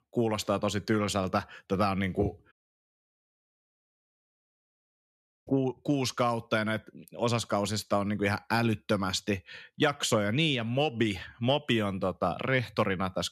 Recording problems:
audio cutting out; at 2.5 s for 3 s

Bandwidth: 13.5 kHz